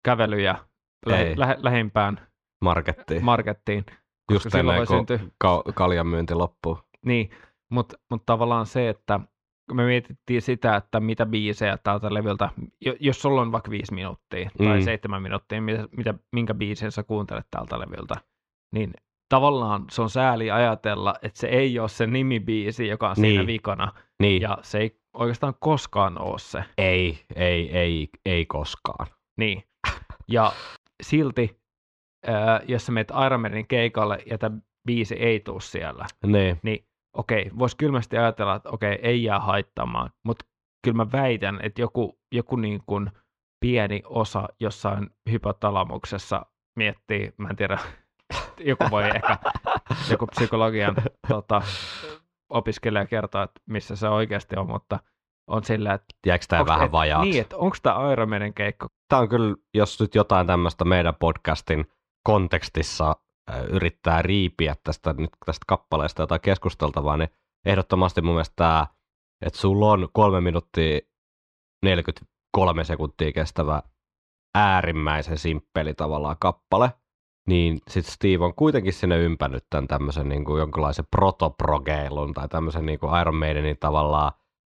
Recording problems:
muffled; slightly; fading above 3.5 kHz

